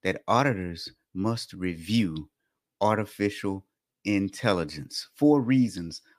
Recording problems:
none

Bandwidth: 15 kHz